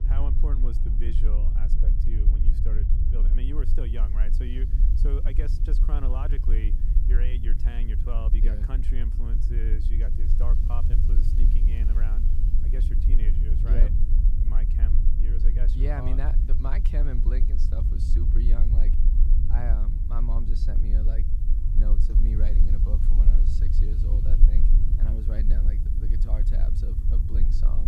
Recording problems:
low rumble; loud; throughout; 2 dB below the speech
murmuring crowd; faint; throughout; 30 dB below the speech
hiss; faint; from 3.5 s on; 25 dB below the speech
crackling; faint; from 10 to 12 s; 25 dB below the speech
abrupt cut into speech; at the end

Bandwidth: 14.5 kHz